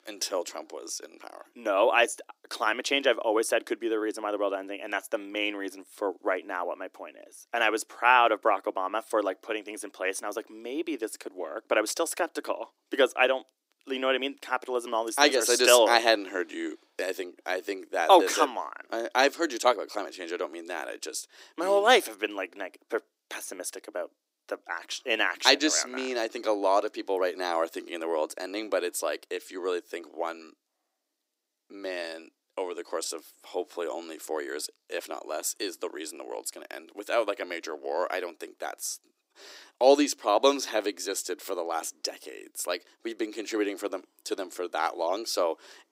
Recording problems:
thin; somewhat; fading below 300 Hz

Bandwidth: 15.5 kHz